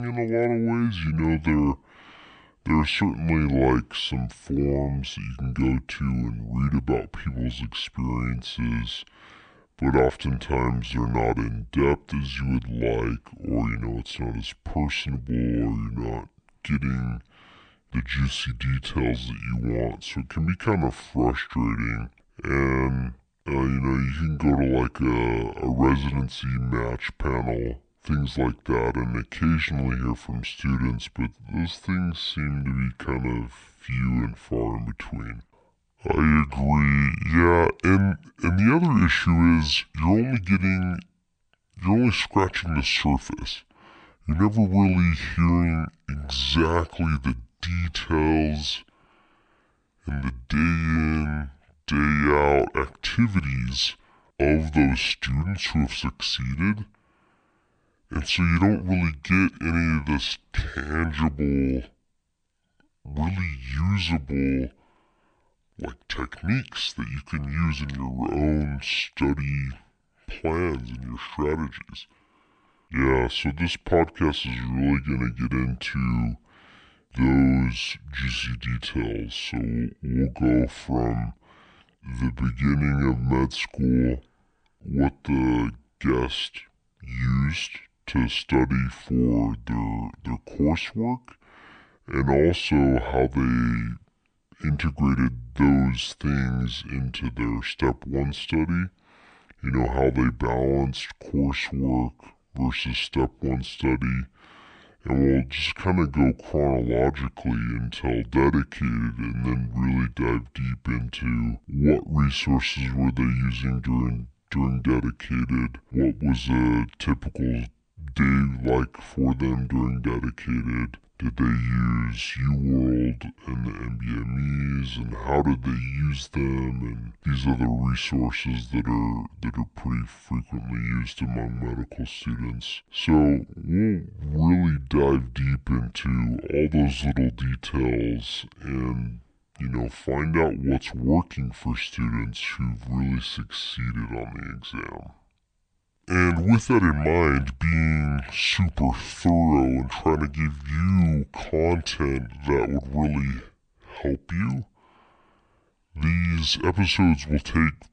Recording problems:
wrong speed and pitch; too slow and too low; 0.6 times normal speed
abrupt cut into speech; at the start

